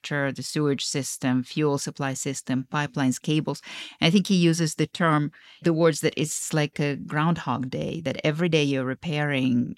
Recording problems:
uneven, jittery; slightly; from 2.5 to 8.5 s

